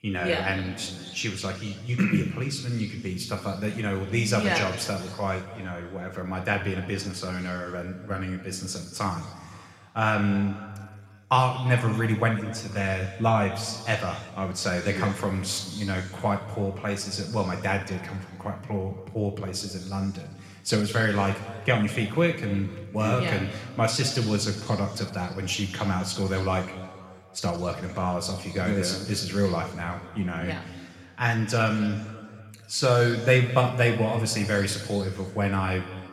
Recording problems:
room echo; noticeable; dies away in 1.9 s
off-mic speech; somewhat distant

